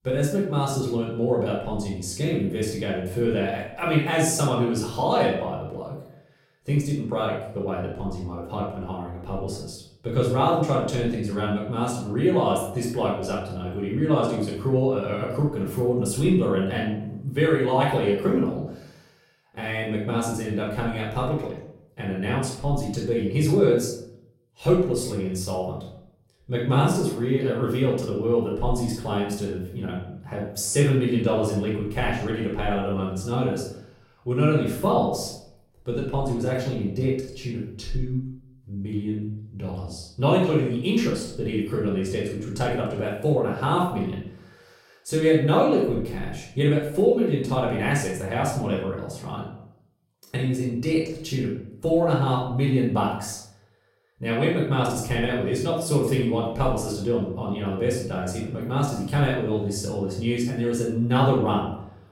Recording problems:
off-mic speech; far
room echo; noticeable; dies away in 0.6 s

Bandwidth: 16 kHz